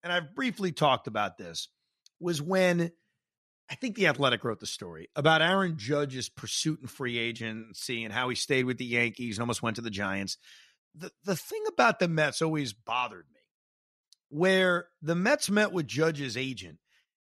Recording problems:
none

